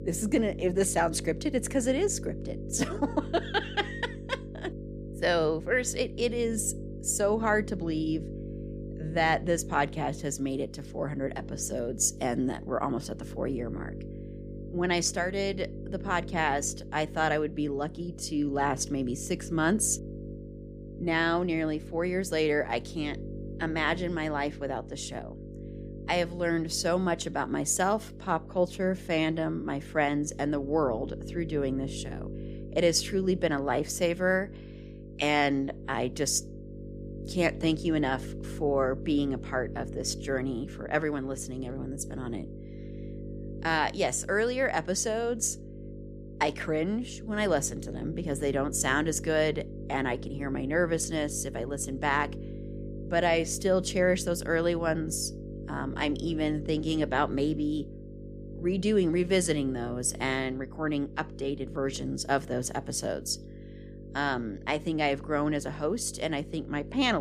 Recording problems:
electrical hum; noticeable; throughout; 50 Hz, 15 dB below the speech
abrupt cut into speech; at the end

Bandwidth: 15 kHz